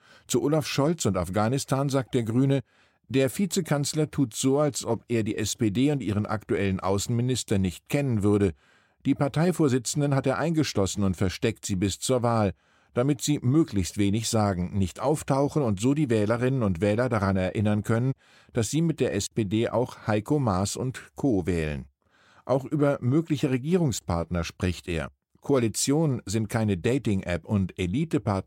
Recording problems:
none

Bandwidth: 16 kHz